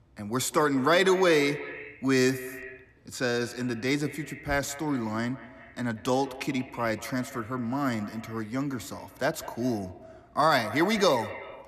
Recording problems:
echo of what is said; noticeable; throughout; 190 ms later, 15 dB below the speech

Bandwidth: 14 kHz